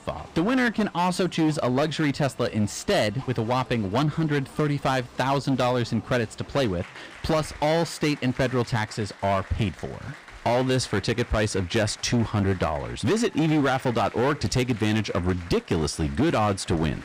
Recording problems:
distortion; slight; 11% of the sound clipped
crowd noise; noticeable; throughout; 20 dB below the speech

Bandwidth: 15.5 kHz